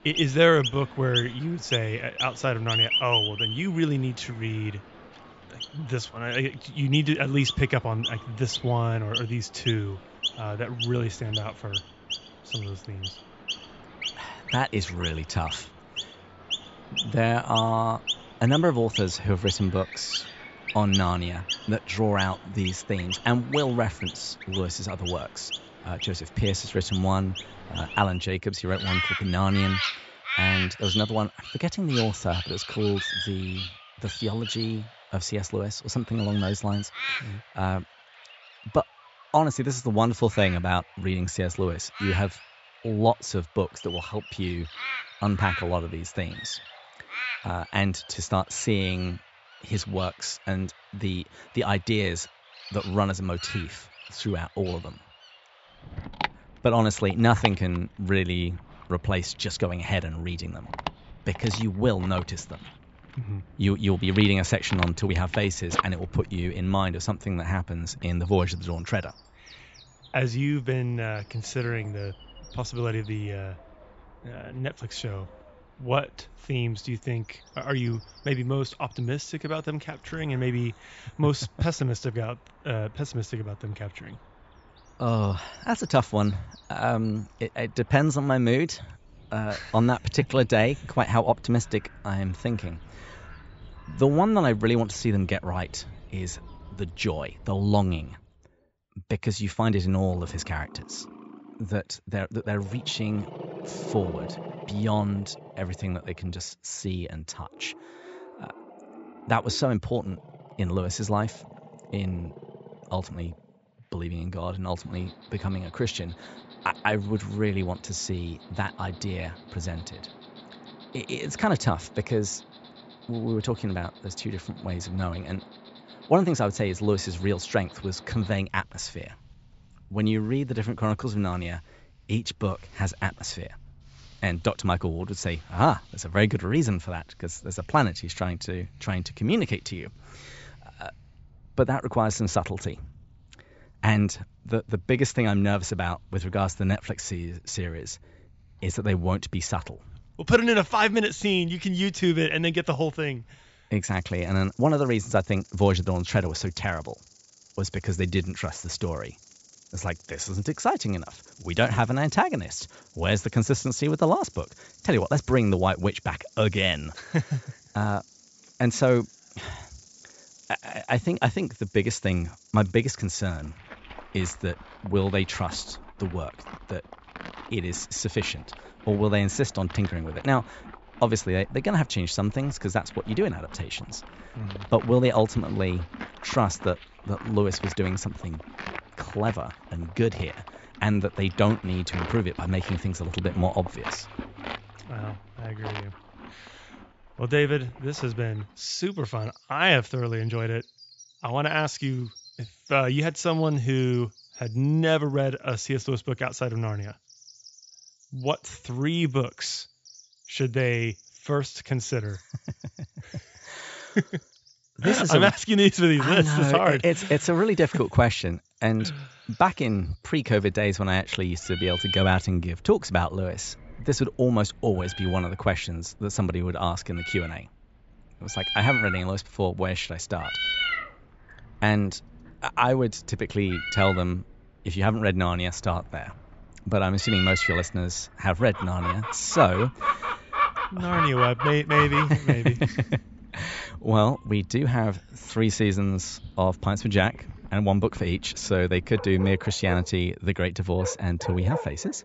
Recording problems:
high frequencies cut off; noticeable; nothing above 8 kHz
animal sounds; loud; throughout; 7 dB below the speech

